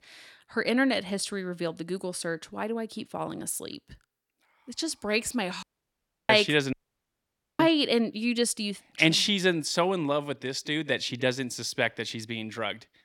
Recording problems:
audio cutting out; at 5.5 s for 0.5 s and at 6.5 s for 1 s

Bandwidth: 17 kHz